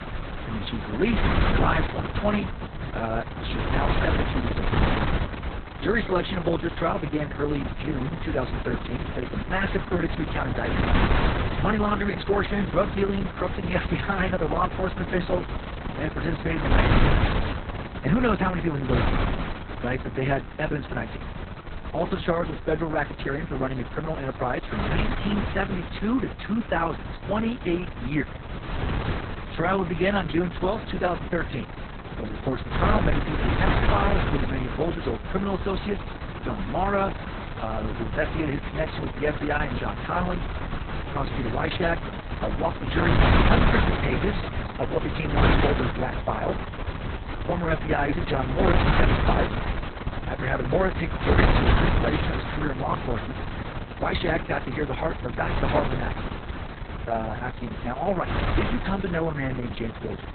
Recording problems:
garbled, watery; badly; nothing above 4 kHz
wind noise on the microphone; heavy; 3 dB below the speech

